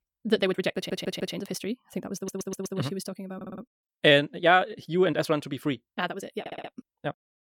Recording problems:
wrong speed, natural pitch; too fast; 1.7 times normal speed
audio stuttering; 4 times, first at 1 s

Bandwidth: 17.5 kHz